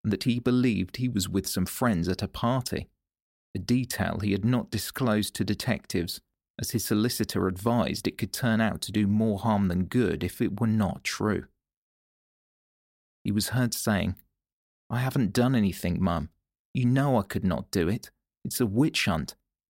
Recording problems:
none

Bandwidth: 16 kHz